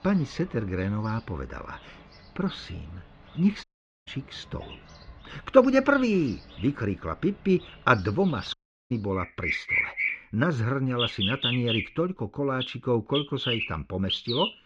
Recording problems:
muffled; slightly; fading above 3 kHz
animal sounds; loud; throughout; 2 dB below the speech
audio cutting out; at 3.5 s and at 8.5 s

